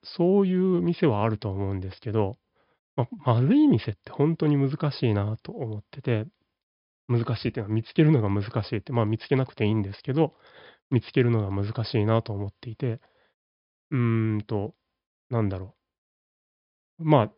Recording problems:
high frequencies cut off; noticeable; nothing above 5.5 kHz

